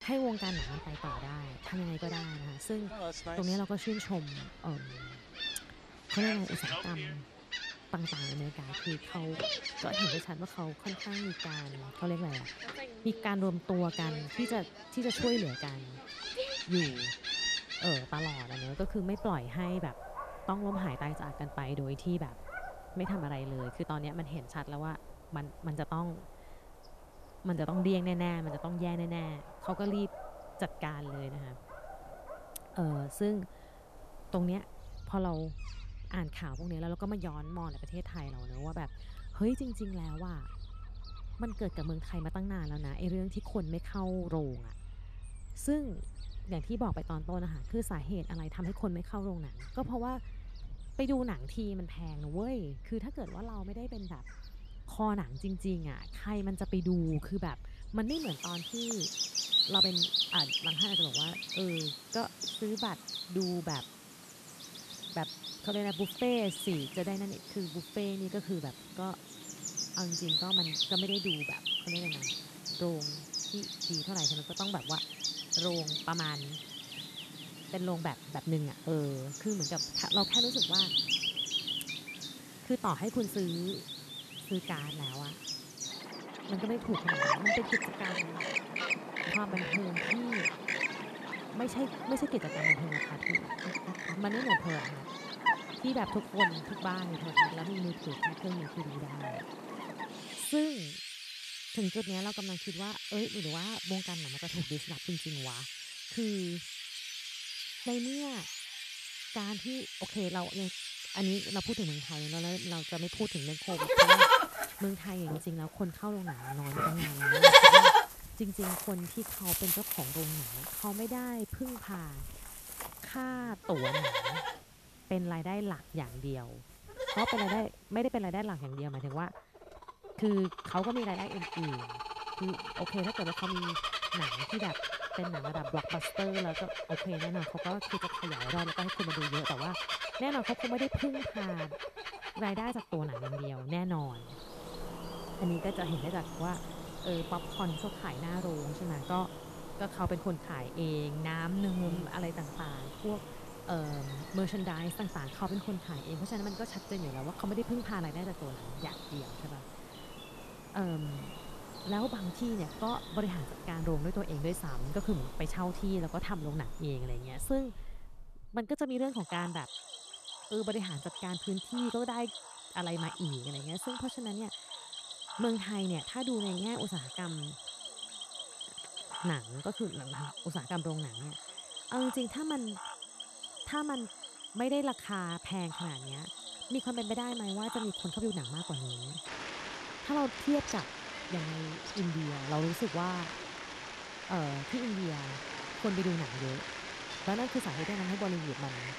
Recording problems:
animal sounds; very loud; throughout; 4 dB above the speech

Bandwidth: 14 kHz